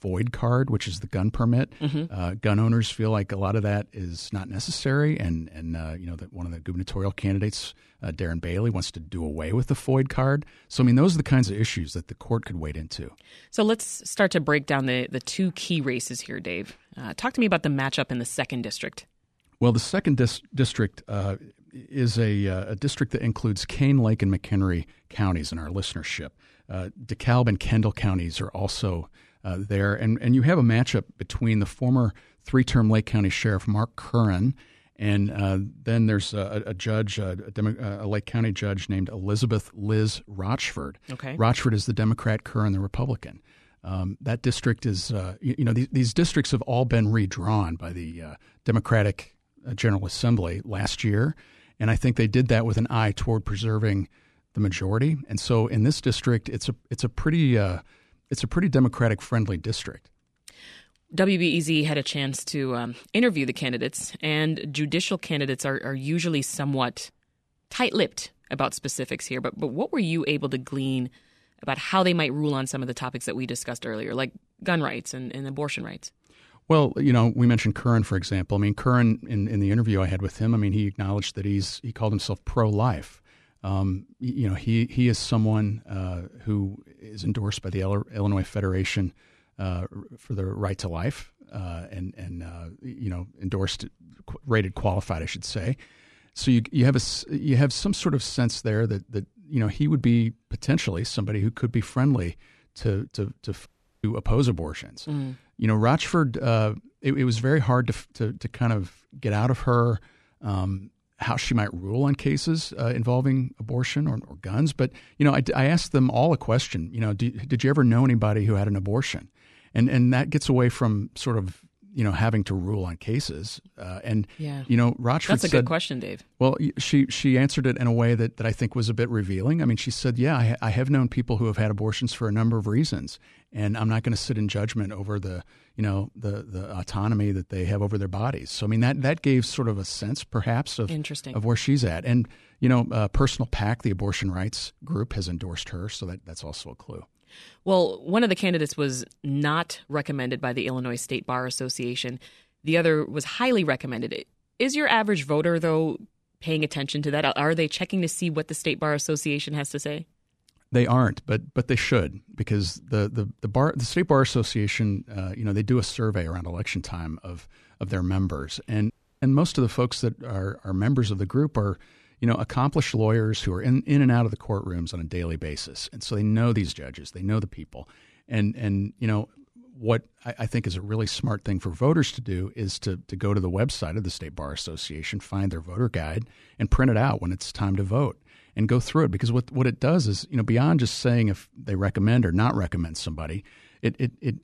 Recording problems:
audio cutting out; at 1:44 and at 2:49

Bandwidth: 13.5 kHz